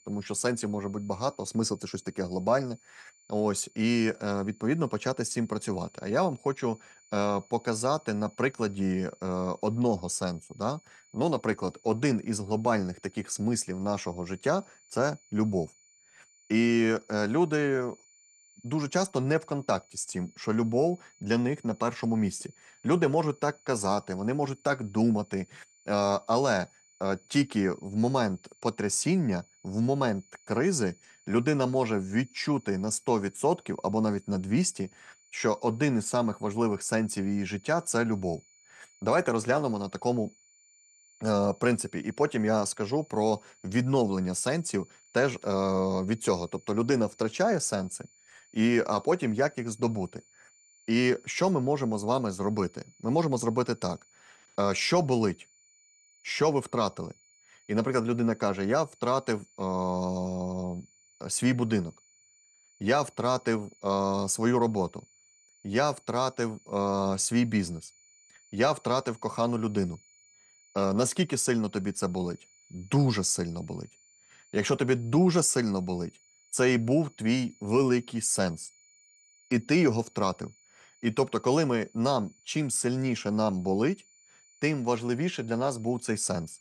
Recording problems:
high-pitched whine; faint; throughout; 7 kHz, 30 dB below the speech

